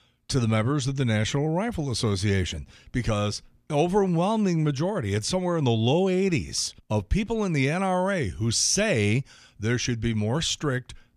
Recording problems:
none

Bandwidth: 14.5 kHz